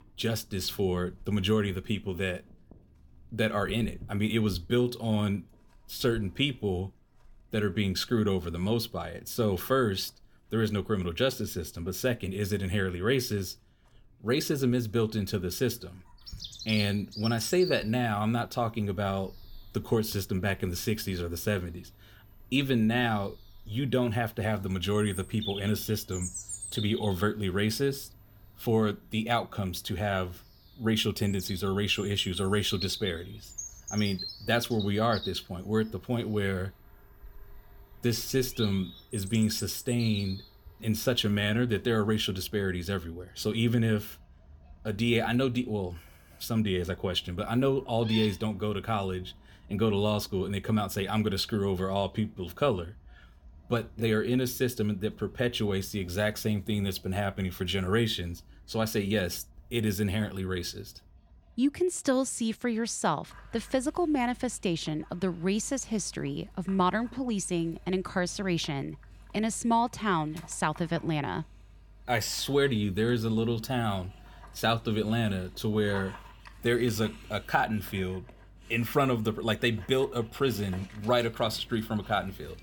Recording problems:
animal sounds; noticeable; throughout; 15 dB below the speech

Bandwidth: 18 kHz